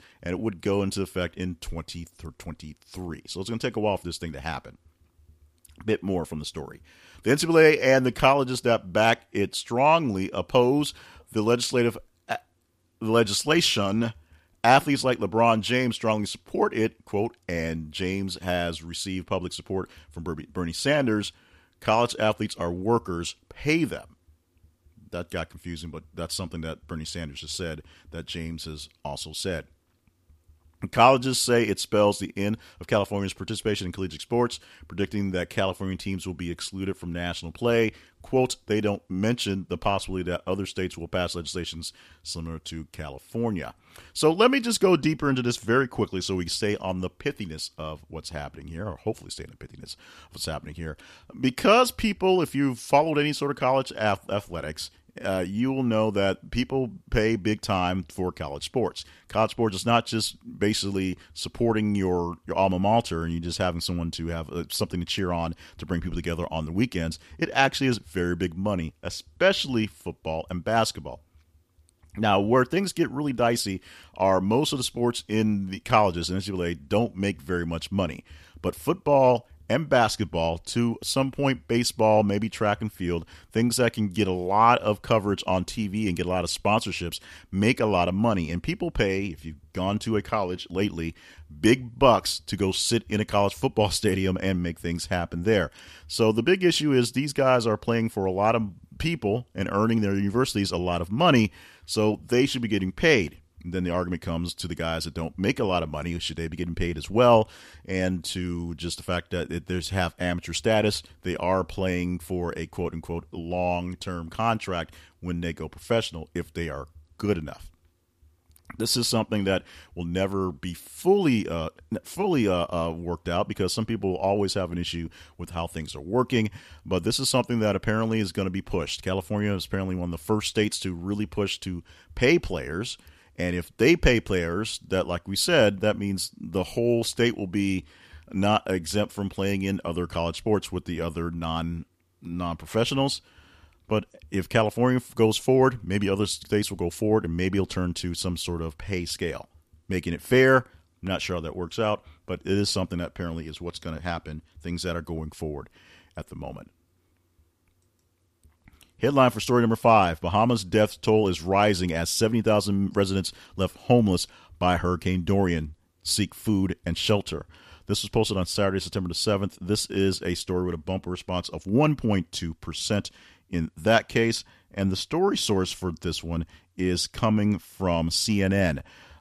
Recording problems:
none

